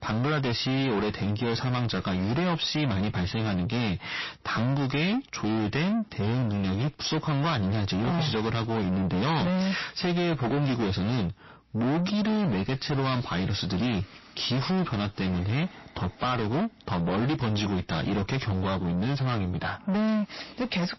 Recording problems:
distortion; heavy; 5 dB below the speech
garbled, watery; slightly; nothing above 5.5 kHz

